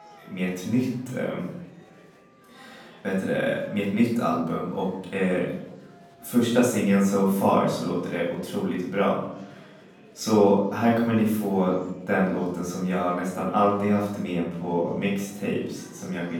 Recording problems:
off-mic speech; far
room echo; noticeable; dies away in 0.7 s
murmuring crowd; faint; throughout; 25 dB below the speech

